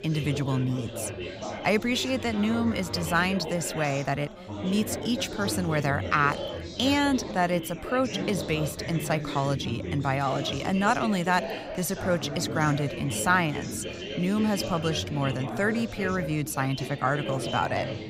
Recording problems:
chatter from many people; loud; throughout; 7 dB below the speech

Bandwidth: 15.5 kHz